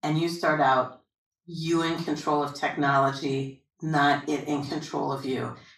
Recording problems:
off-mic speech; far
room echo; slight; dies away in 0.4 s

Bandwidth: 14.5 kHz